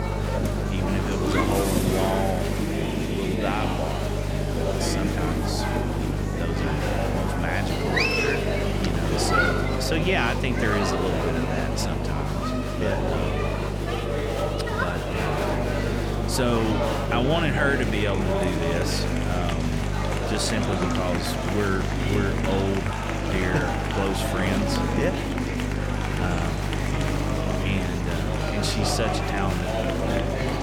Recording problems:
murmuring crowd; very loud; throughout; 1 dB above the speech
electrical hum; loud; throughout; 50 Hz, 9 dB below the speech

